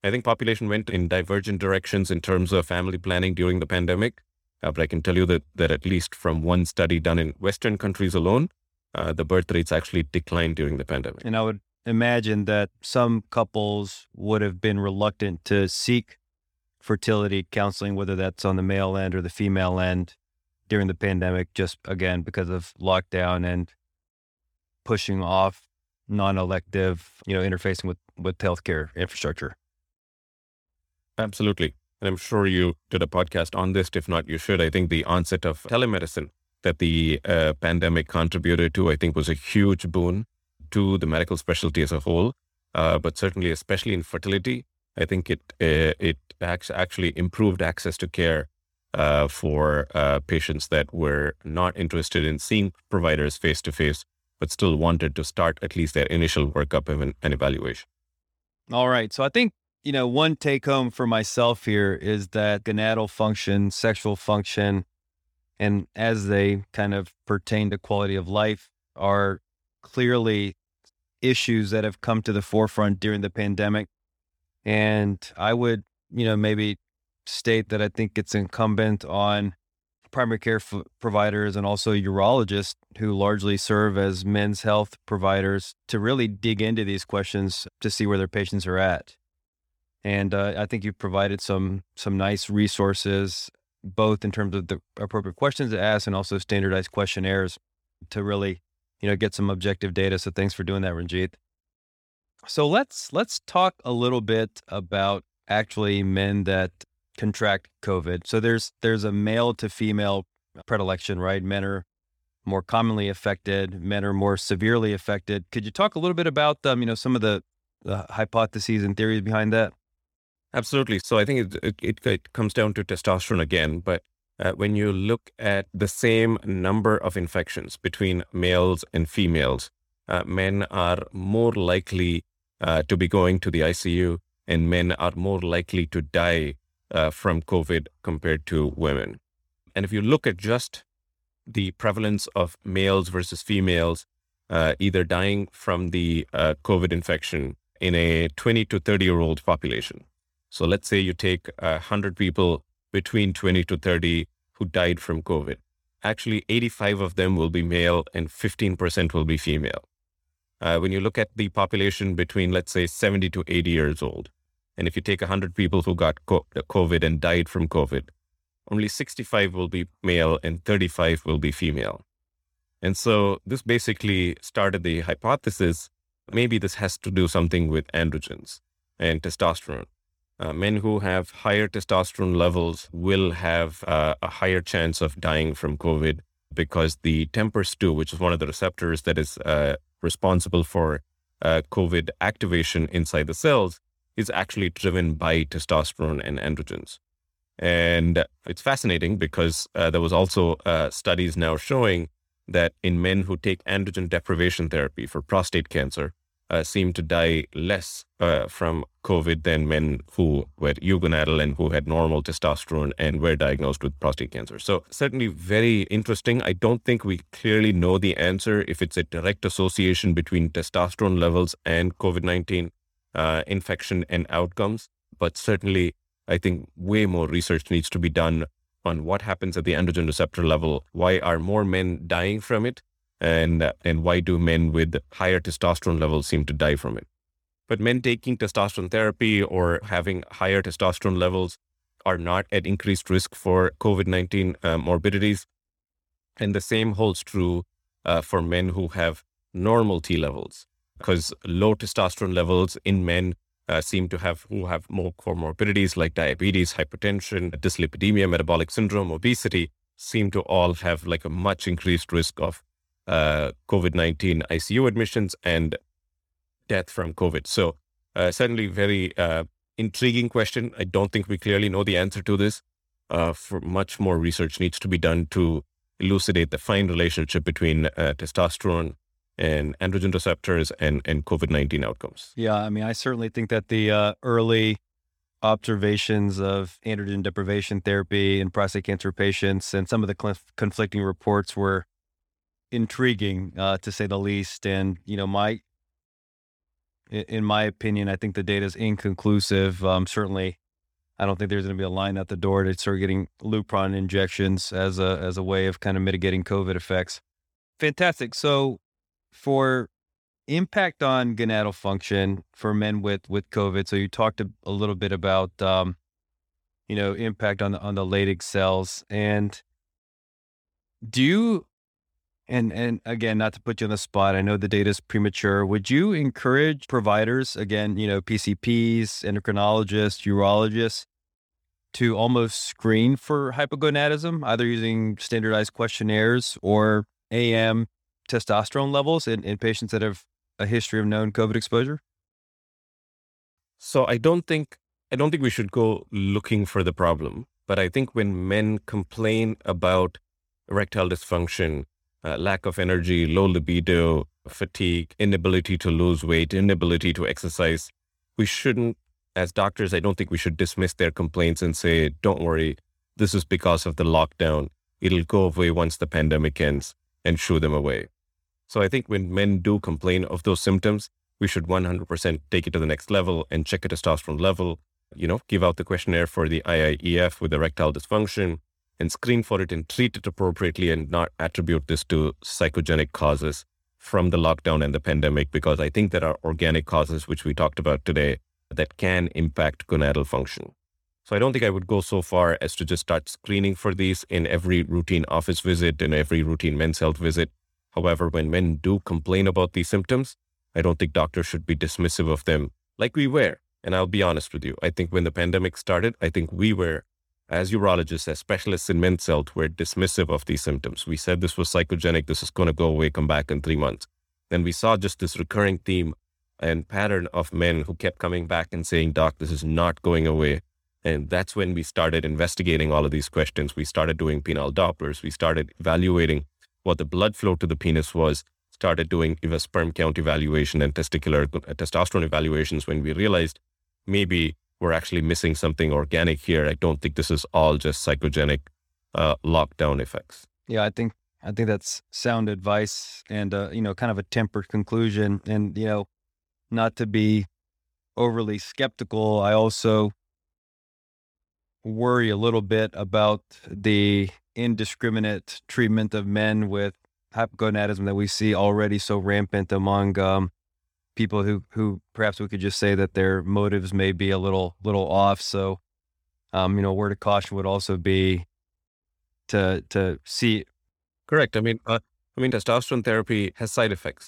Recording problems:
none

